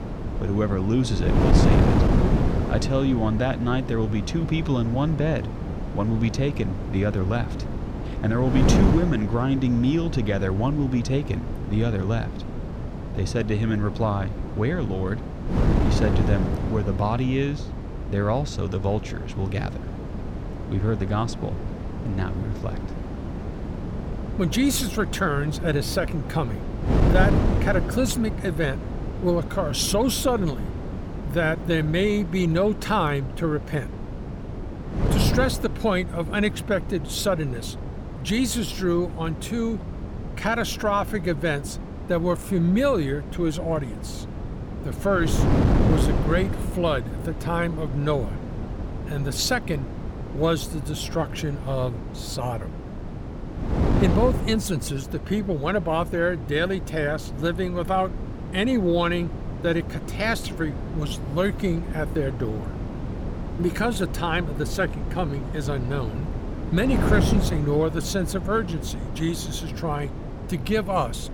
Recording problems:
wind noise on the microphone; heavy; 8 dB below the speech

